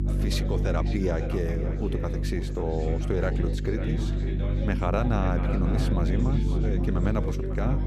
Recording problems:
echo of what is said; strong; throughout; 550 ms later, 10 dB below the speech
electrical hum; loud; throughout; 50 Hz, 8 dB below the speech
background chatter; loud; throughout; 3 voices, 6 dB below the speech

